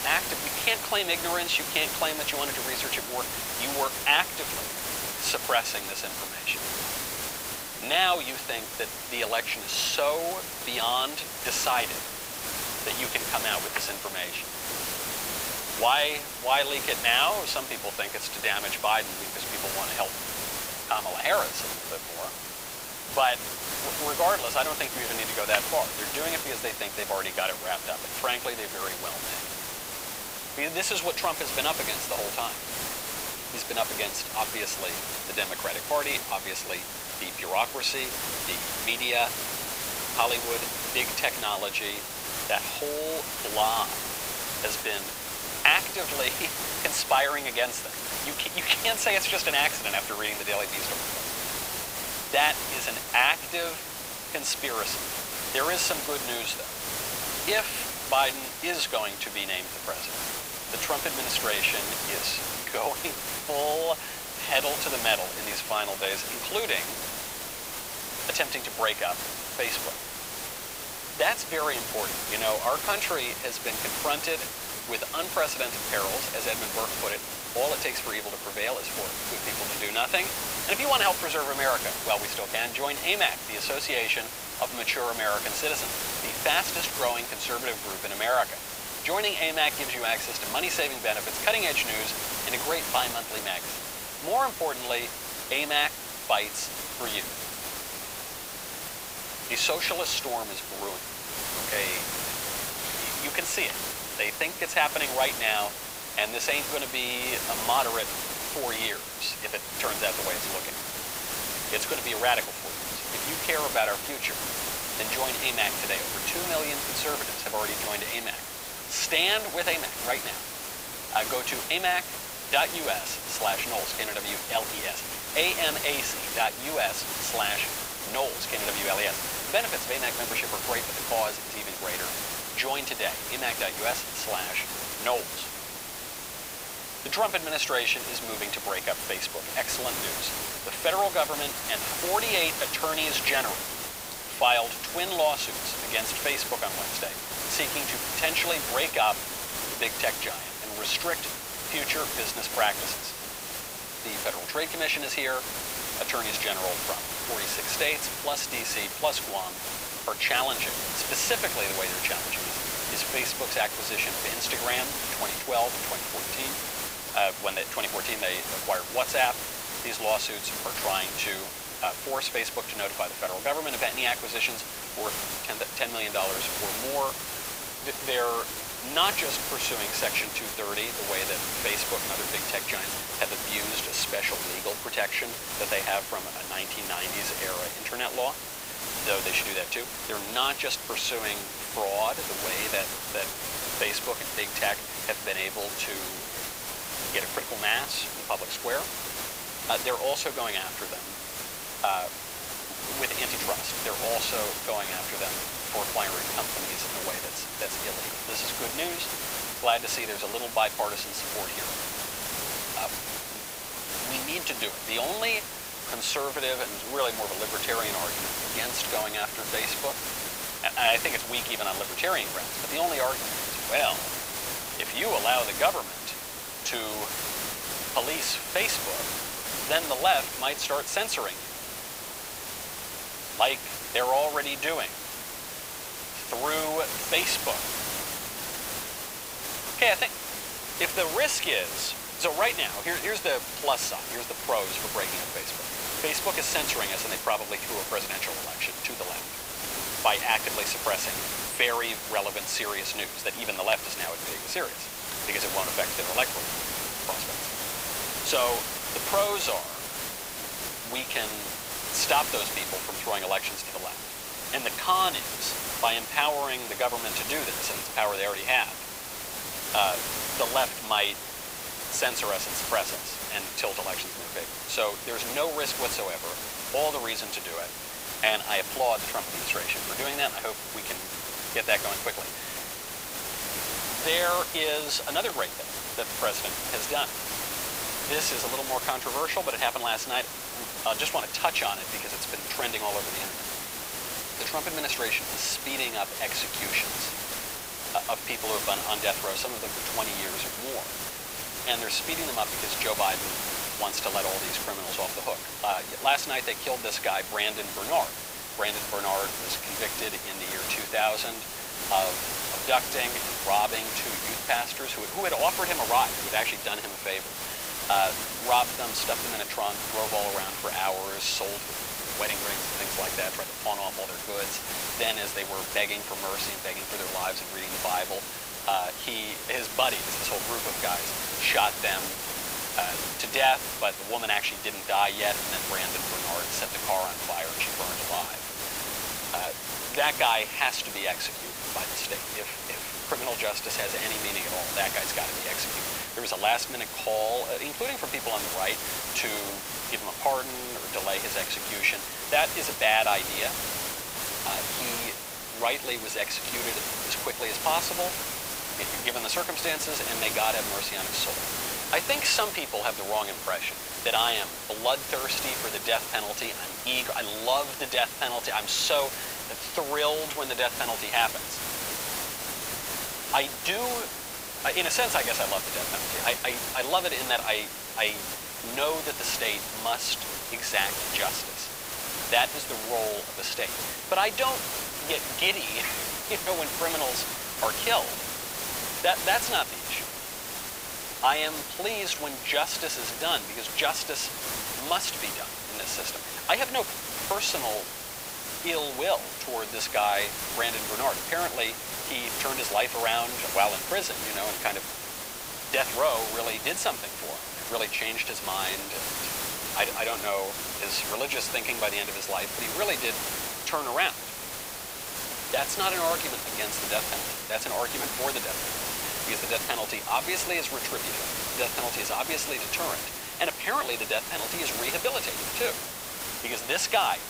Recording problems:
thin; very; fading below 800 Hz
hiss; loud; throughout; 2 dB below the speech

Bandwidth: 15.5 kHz